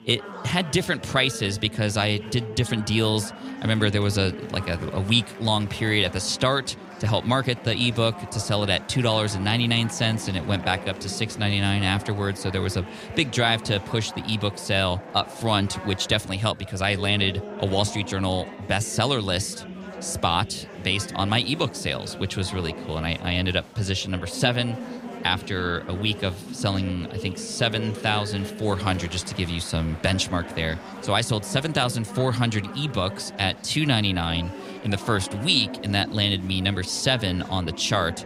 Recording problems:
chatter from many people; noticeable; throughout; 15 dB below the speech

